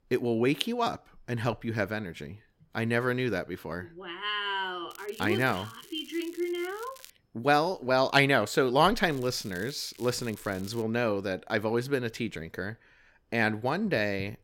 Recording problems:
crackling; faint; from 5 to 7 s and from 9 to 11 s; 20 dB below the speech

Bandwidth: 16.5 kHz